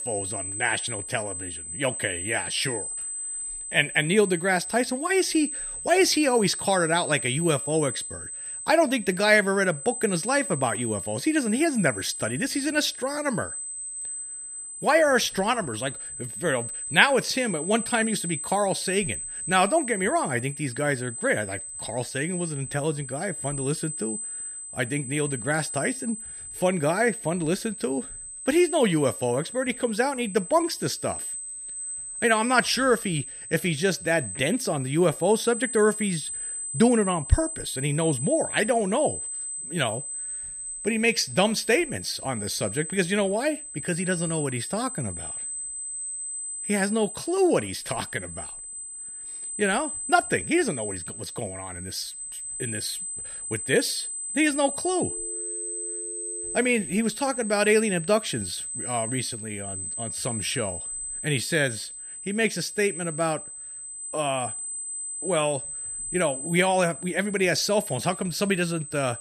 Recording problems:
high-pitched whine; loud; throughout; 8 kHz, 7 dB below the speech
phone ringing; faint; from 55 to 57 s; peak 15 dB below the speech

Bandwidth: 14.5 kHz